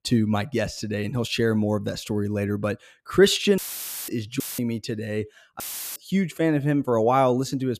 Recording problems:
audio cutting out; filled with static; at 3.5 s for 0.5 s, at 4.5 s and at 5.5 s

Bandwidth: 14.5 kHz